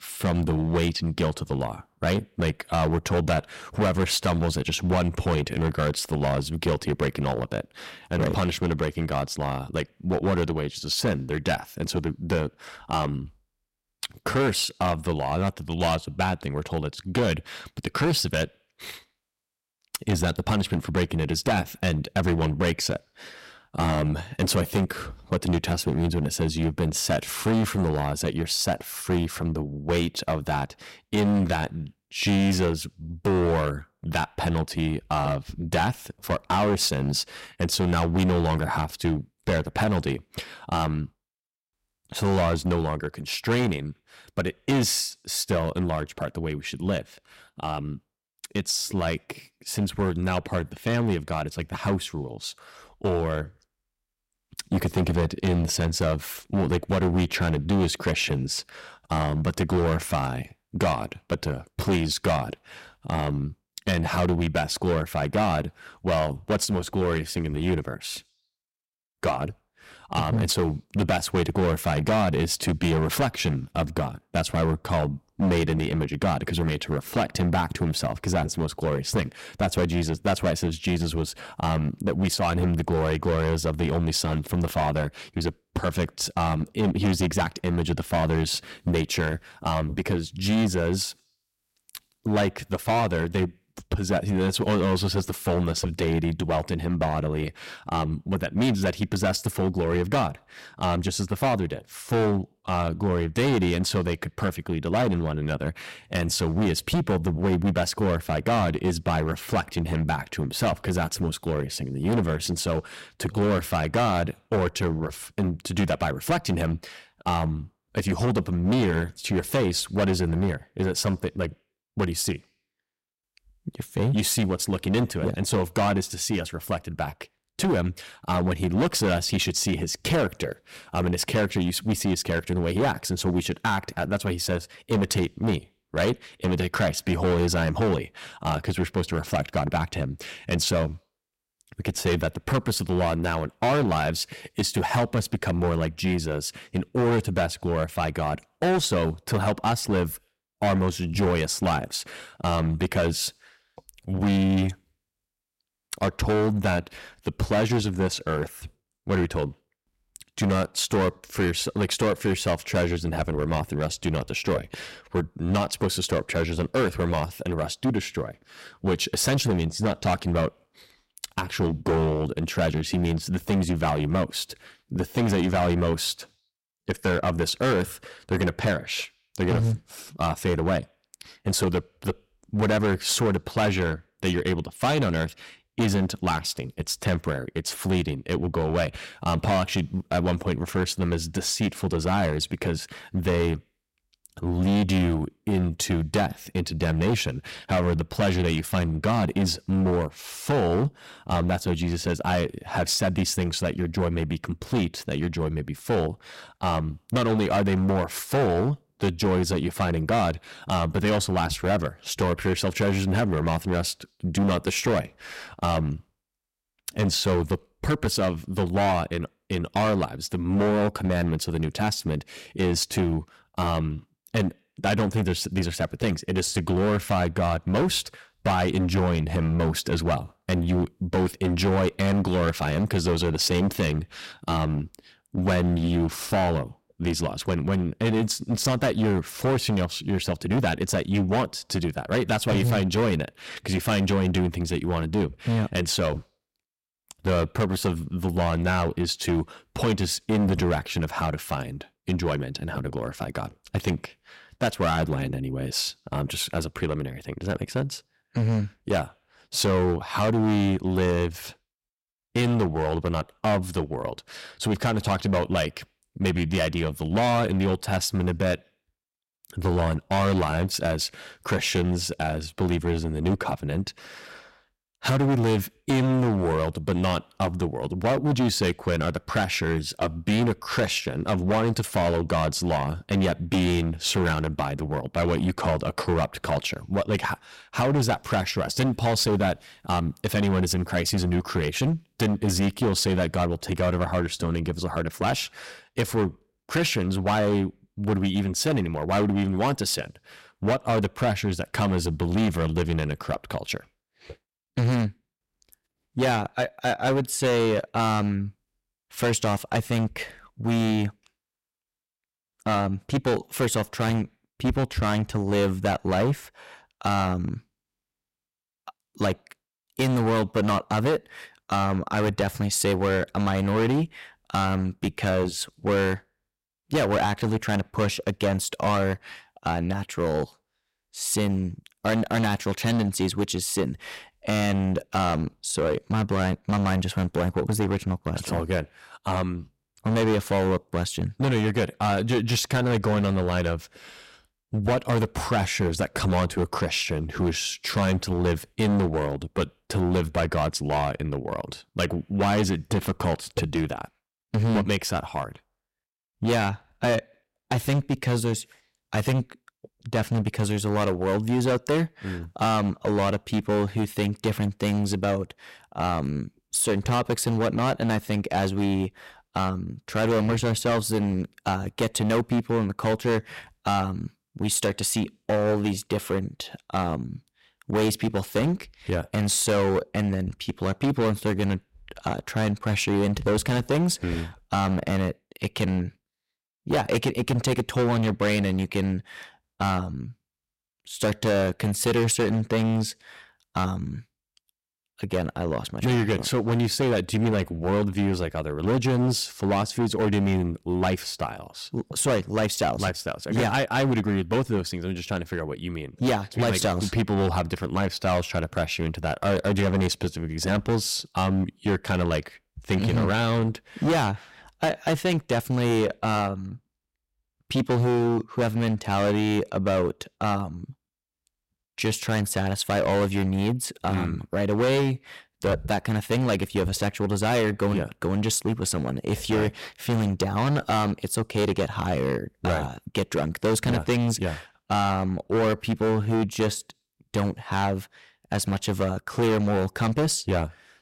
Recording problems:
distortion; heavy; 12% of the sound clipped

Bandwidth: 16 kHz